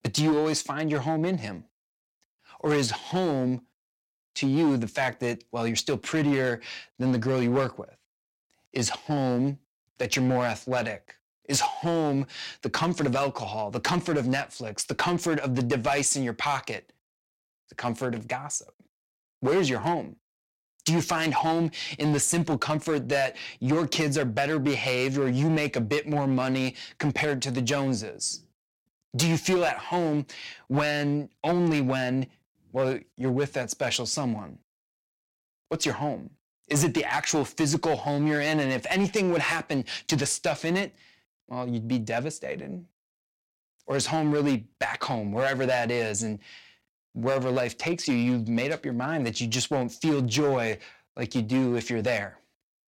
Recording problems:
distortion; slight; 5% of the sound clipped

